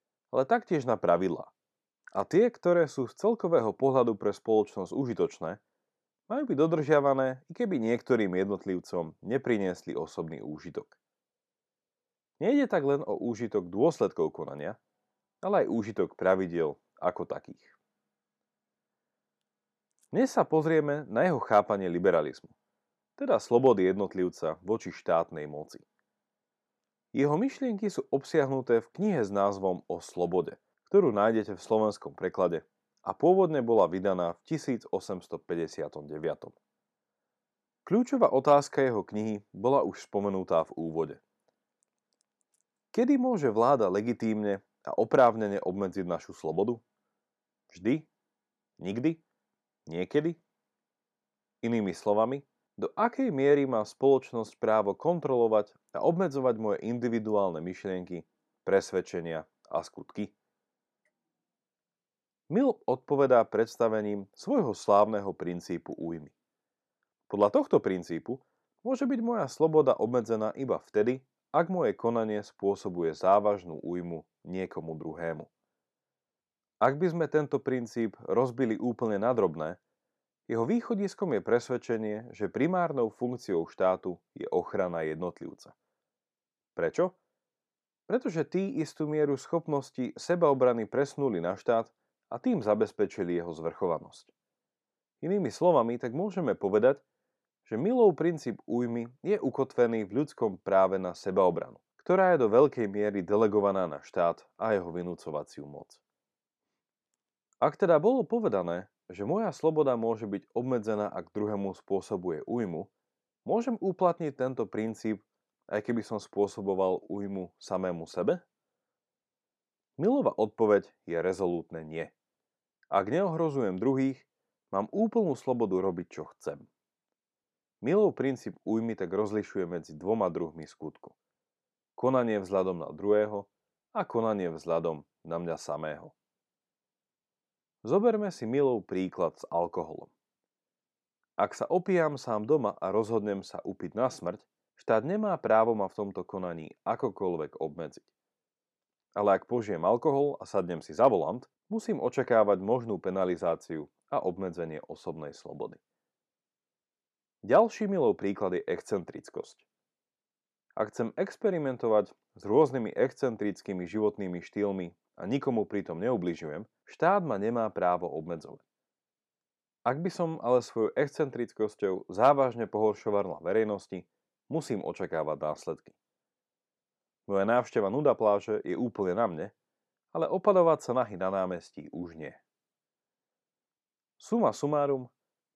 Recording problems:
none

